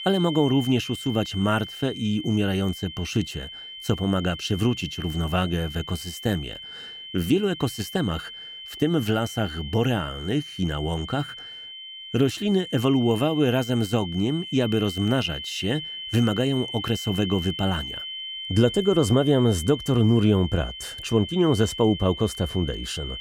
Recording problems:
high-pitched whine; noticeable; throughout; 3 kHz, 10 dB below the speech

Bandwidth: 16.5 kHz